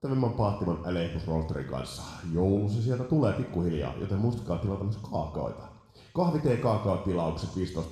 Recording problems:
room echo; noticeable; dies away in 0.9 s
off-mic speech; somewhat distant

